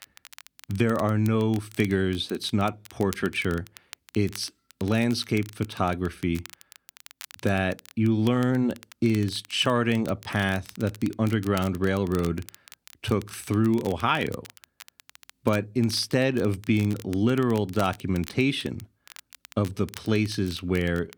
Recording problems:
crackle, like an old record; faint; 20 dB below the speech

